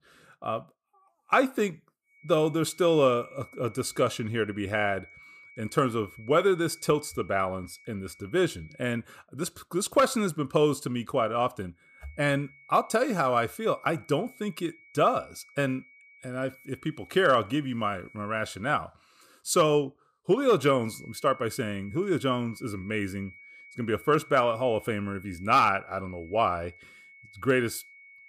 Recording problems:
high-pitched whine; faint; from 2 to 9 s, from 12 to 19 s and from 21 s on; 2.5 kHz, 25 dB below the speech

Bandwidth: 15 kHz